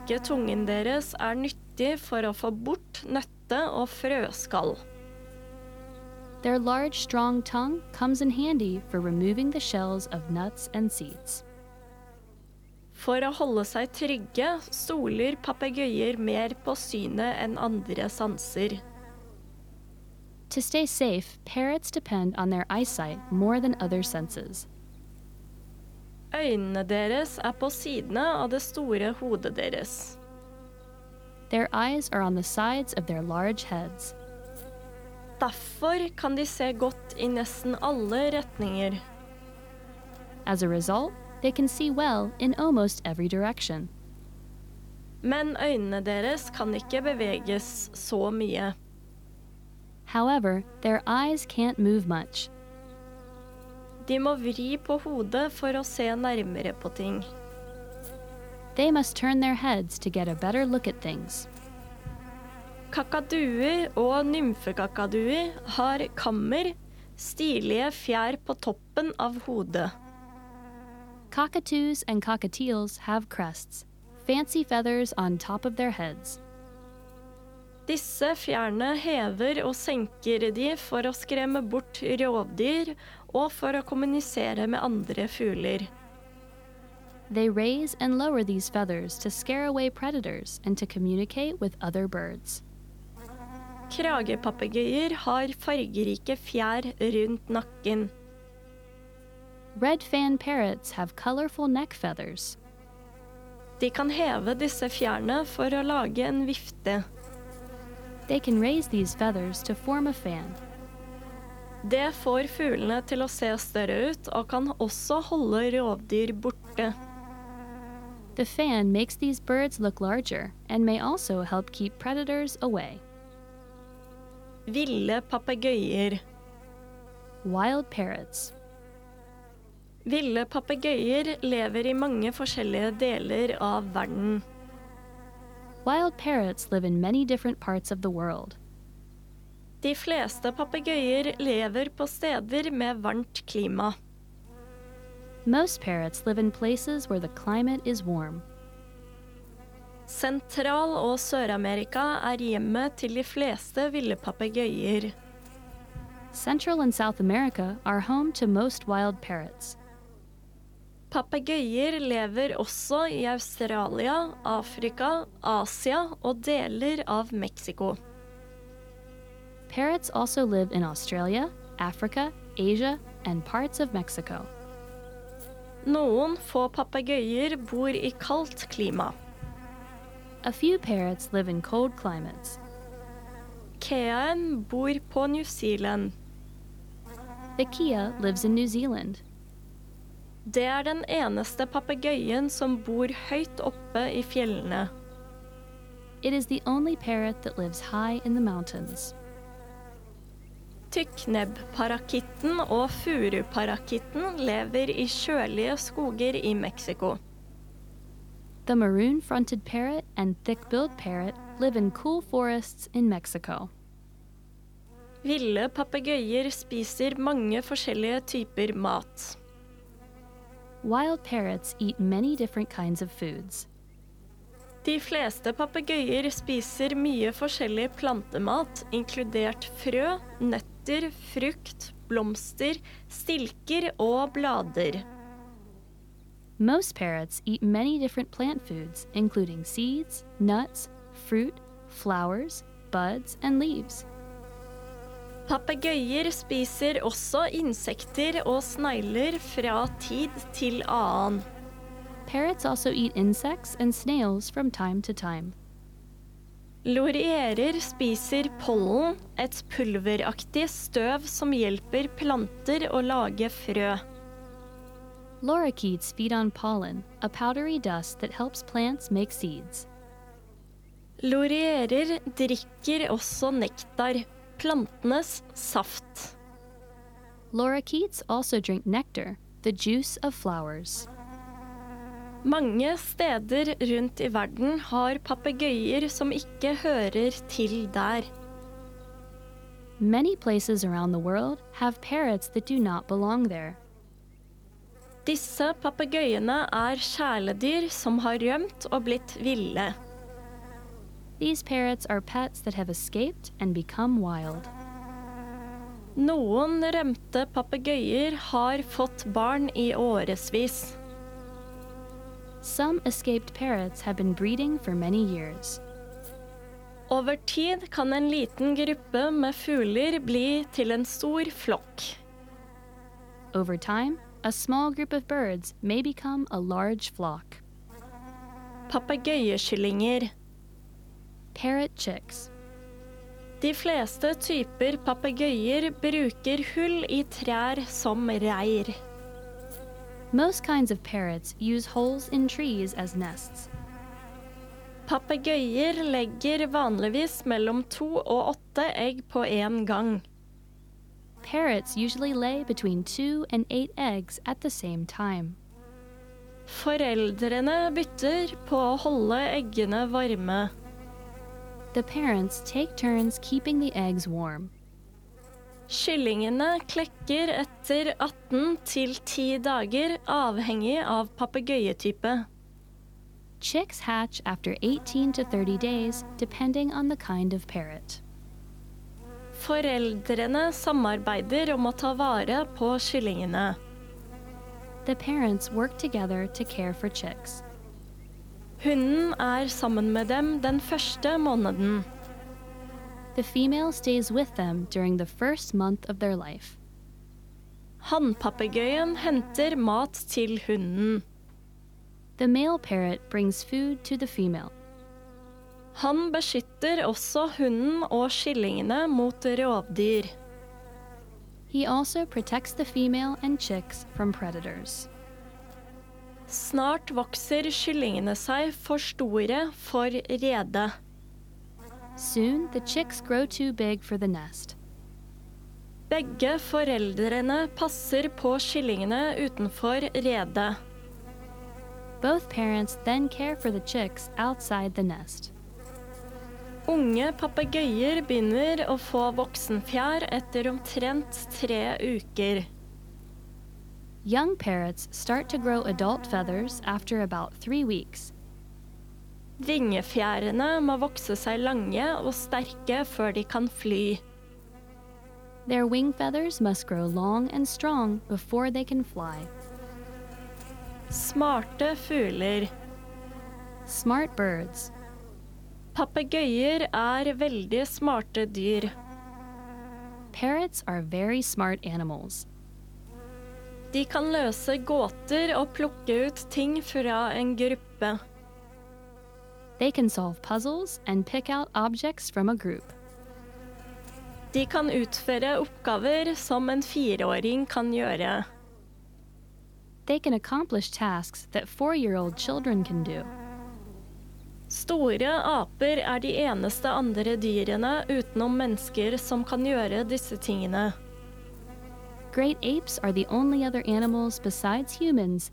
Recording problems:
electrical hum; noticeable; throughout; 50 Hz, 20 dB below the speech

